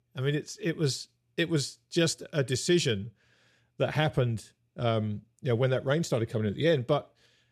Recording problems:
none

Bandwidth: 14 kHz